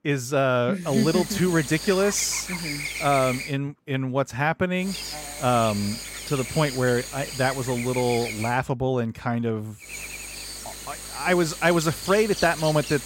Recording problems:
electrical hum; loud; from 1 to 3.5 s, from 5 to 8.5 s and from 10 s on; 50 Hz, 8 dB below the speech

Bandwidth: 16 kHz